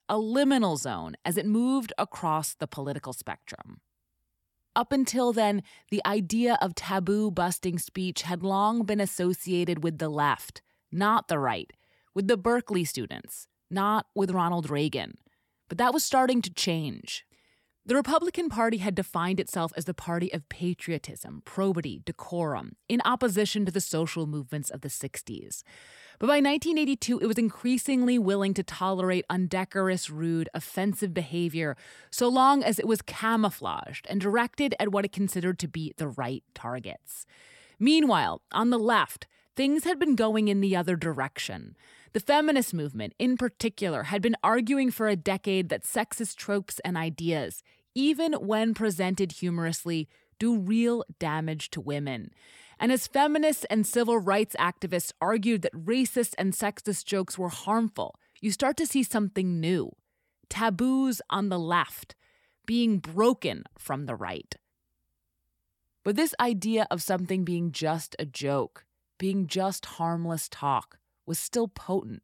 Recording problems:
none

